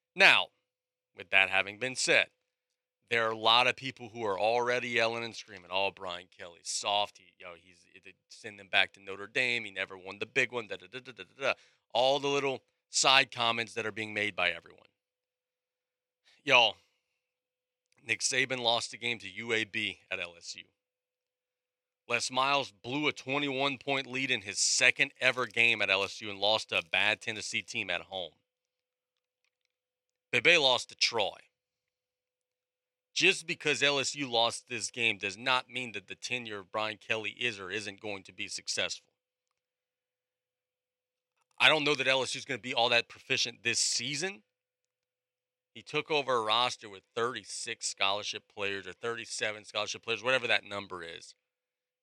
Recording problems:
thin; somewhat; fading below 300 Hz

